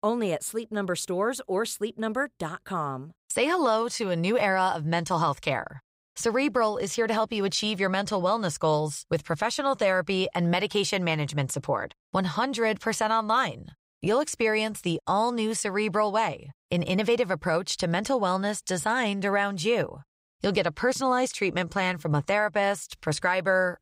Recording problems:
none

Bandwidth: 15.5 kHz